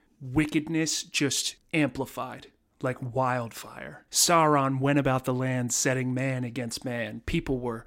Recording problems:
none

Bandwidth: 16 kHz